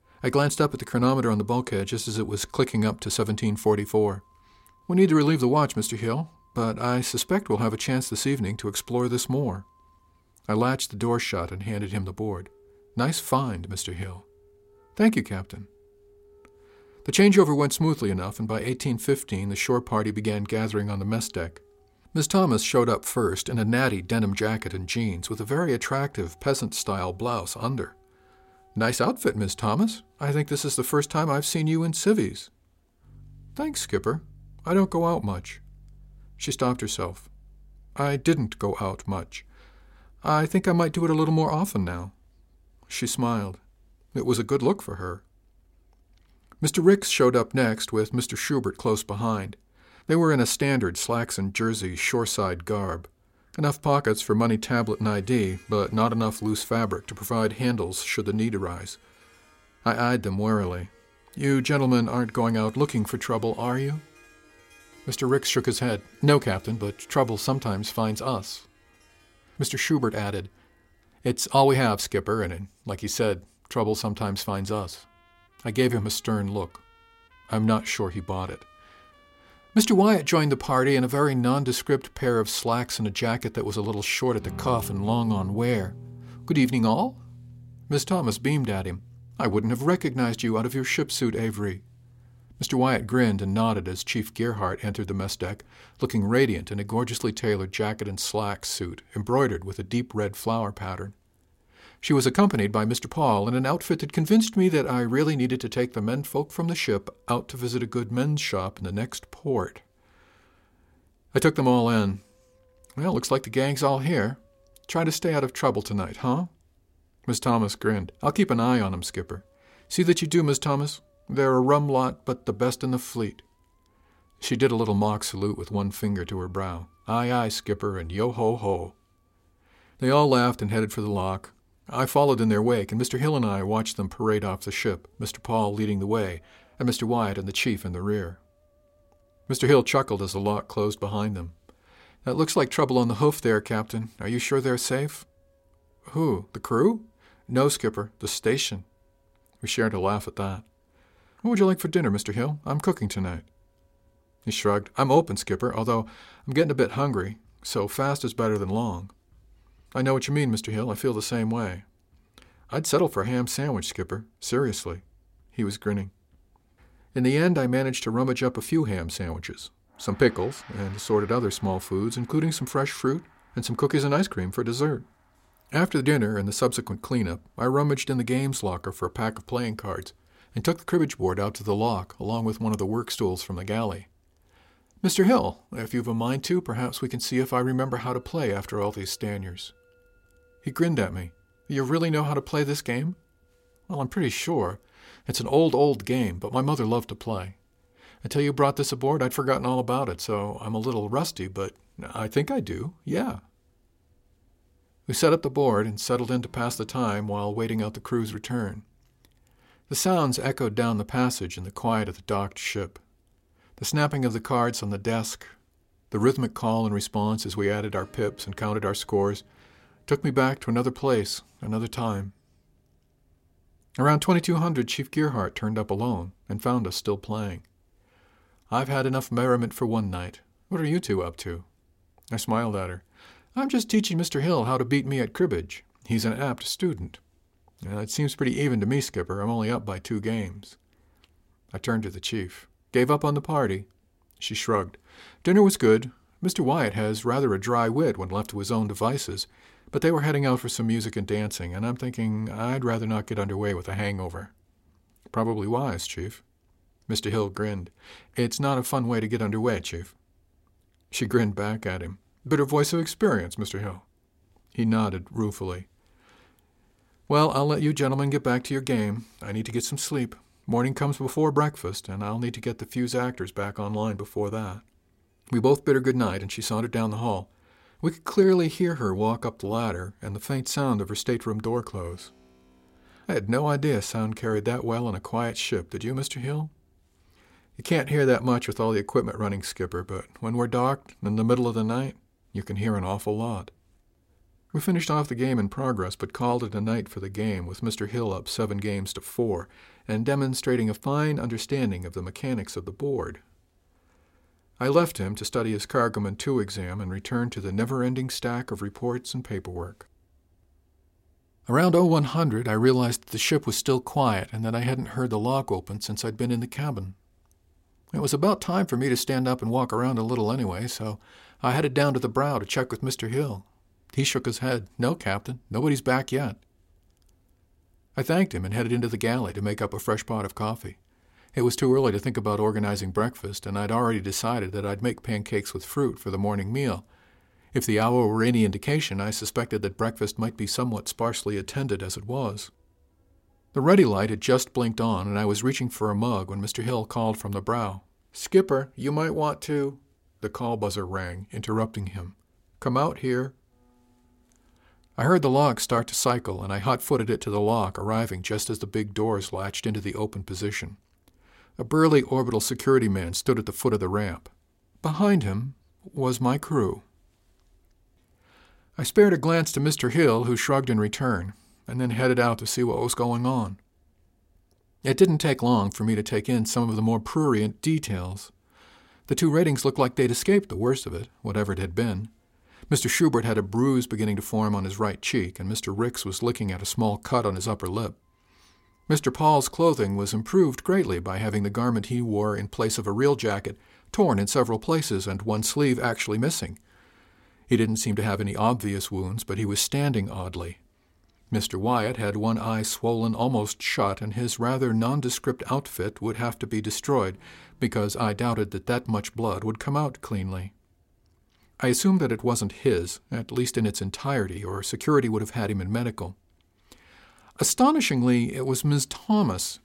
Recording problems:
background music; faint; throughout; 30 dB below the speech

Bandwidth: 16 kHz